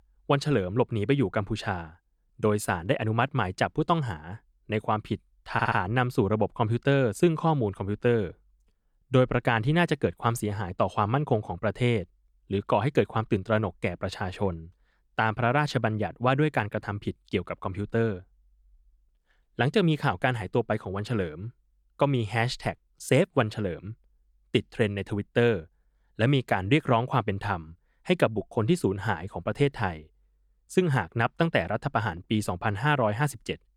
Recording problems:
audio stuttering; at 5.5 s

